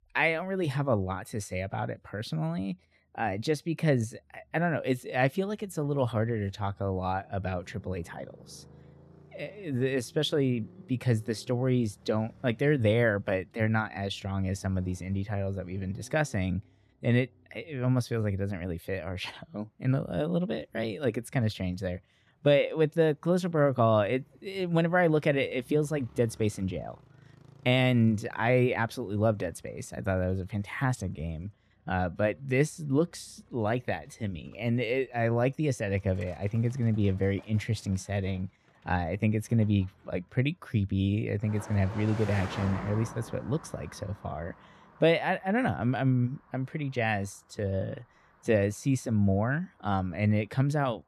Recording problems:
traffic noise; faint; throughout; 20 dB below the speech

